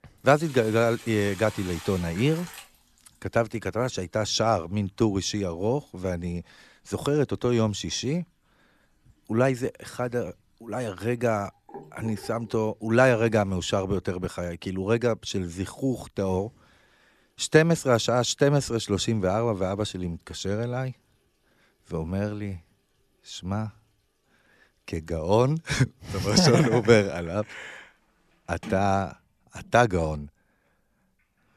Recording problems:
household noises; noticeable; throughout; 20 dB below the speech

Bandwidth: 13.5 kHz